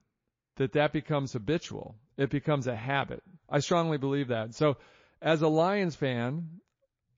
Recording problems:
garbled, watery; slightly

